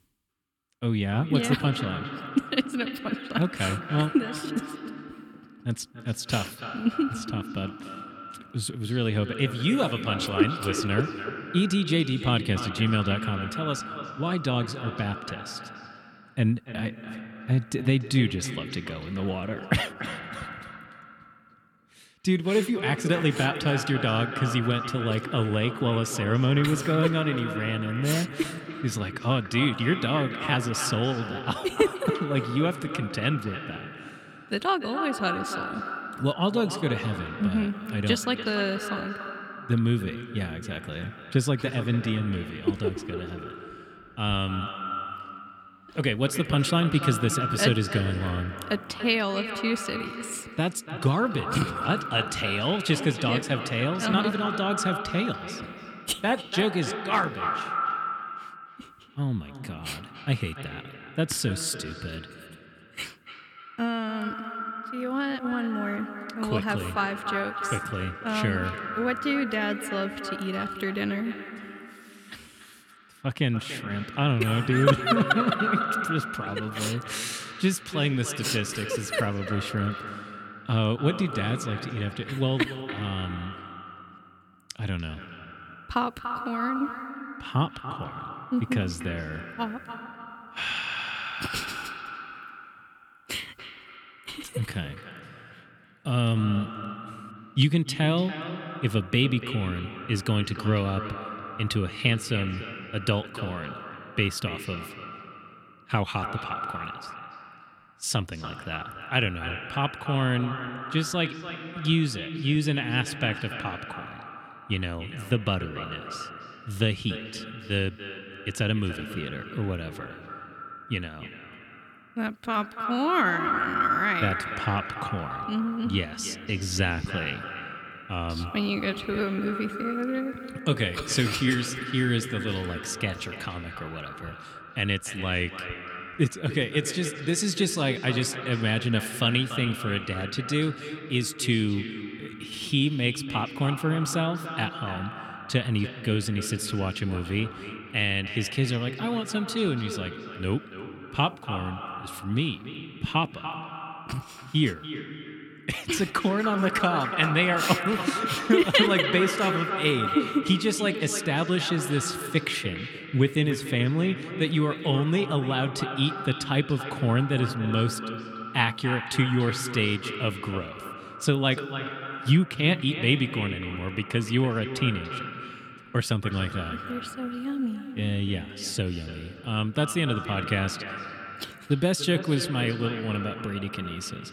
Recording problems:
echo of what is said; strong; throughout; 290 ms later, 8 dB below the speech

